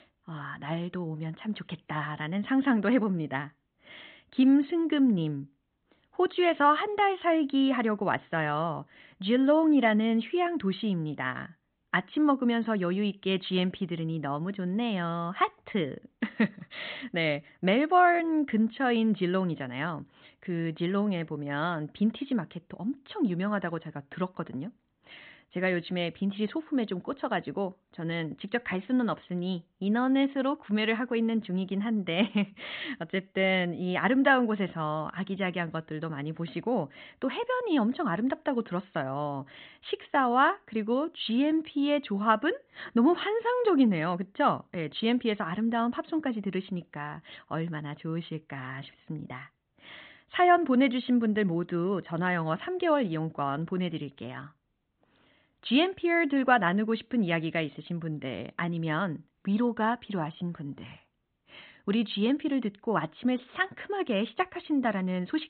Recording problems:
high frequencies cut off; severe; nothing above 4 kHz

